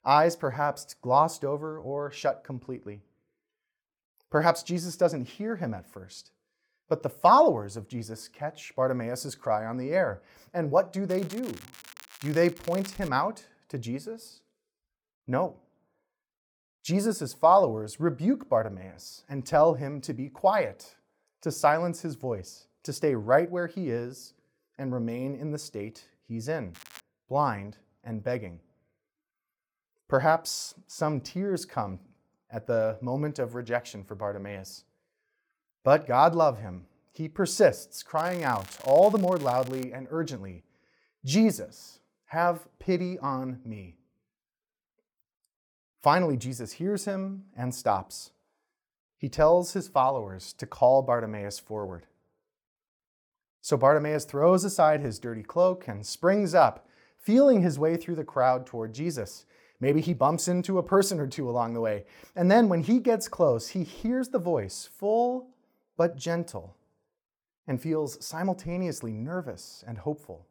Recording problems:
crackling; noticeable; from 11 to 13 s, at 27 s and from 38 to 40 s; 20 dB below the speech

